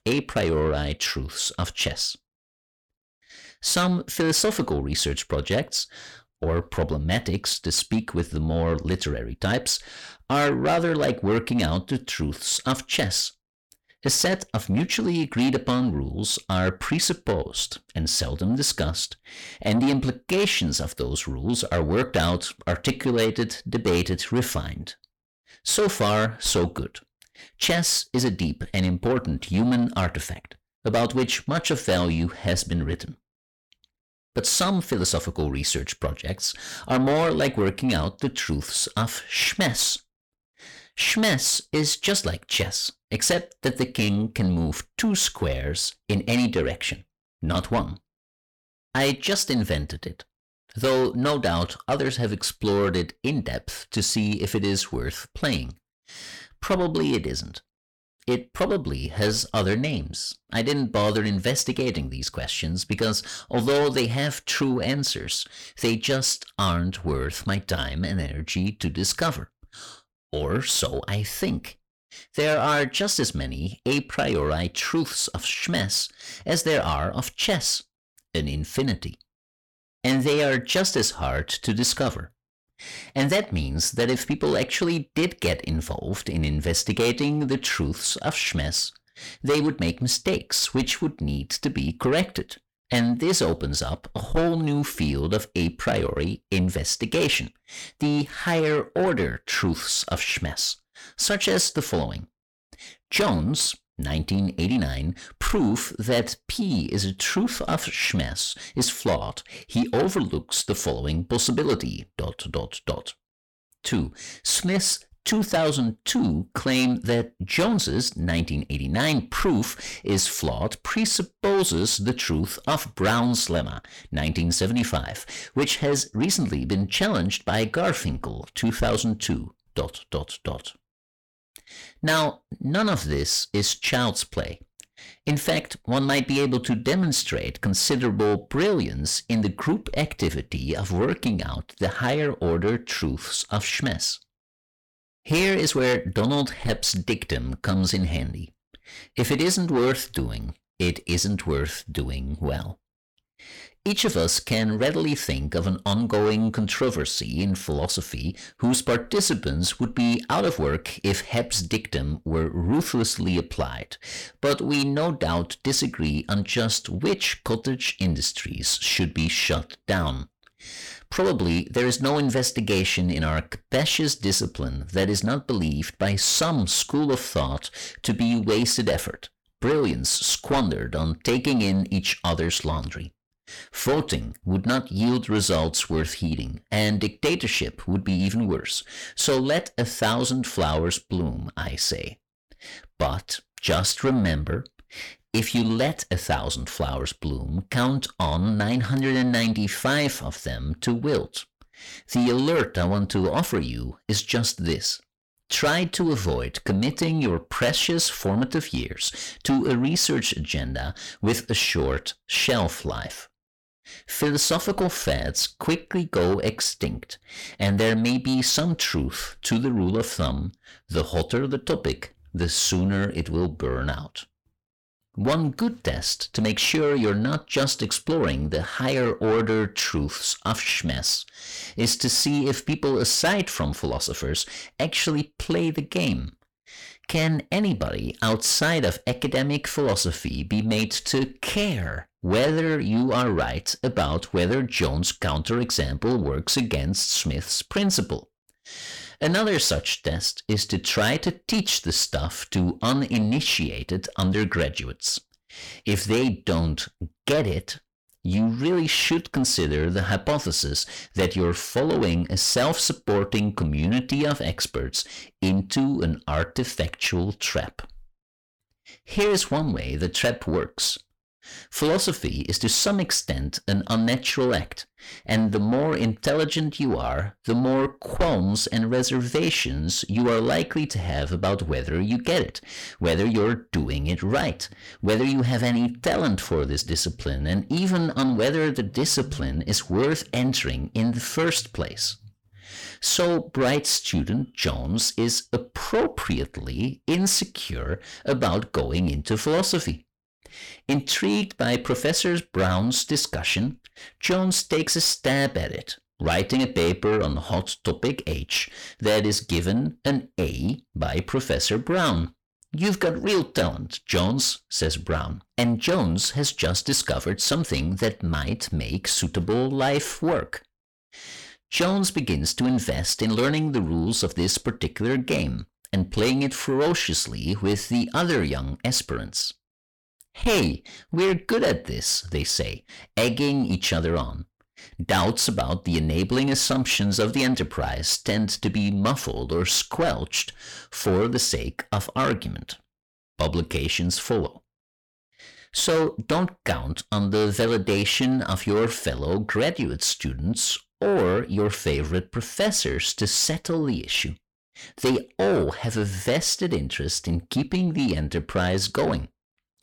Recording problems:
distortion; heavy; 8 dB below the speech

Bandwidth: 18.5 kHz